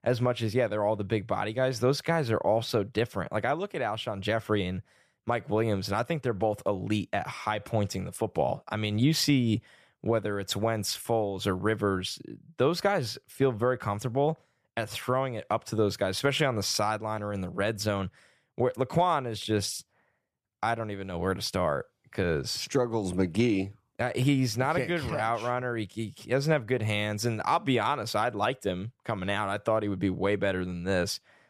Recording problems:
none

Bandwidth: 14.5 kHz